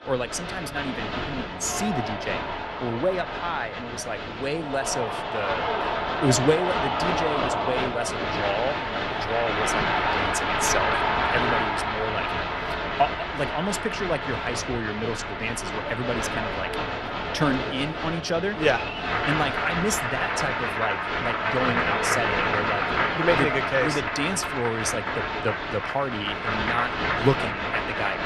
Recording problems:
crowd noise; very loud; throughout; 2 dB above the speech

